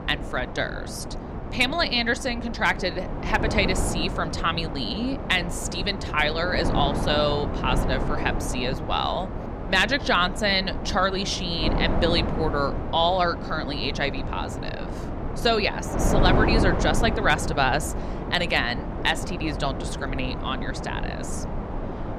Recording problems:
wind noise on the microphone; heavy; 8 dB below the speech

